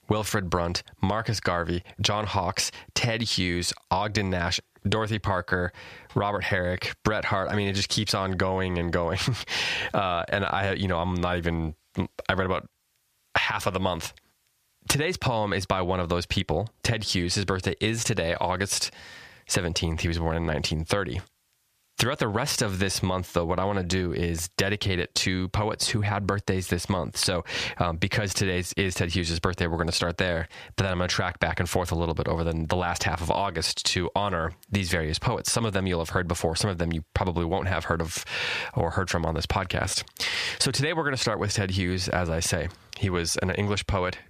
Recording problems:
squashed, flat; somewhat

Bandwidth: 14.5 kHz